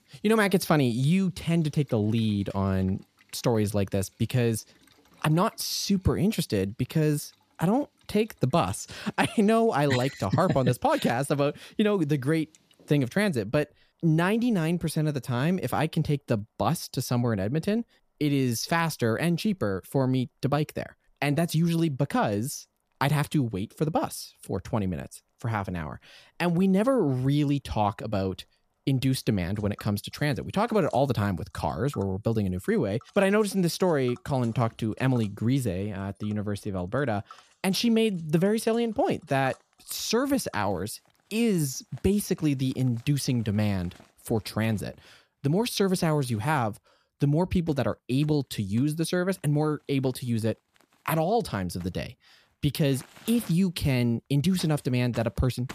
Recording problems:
household noises; faint; throughout; 30 dB below the speech

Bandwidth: 14.5 kHz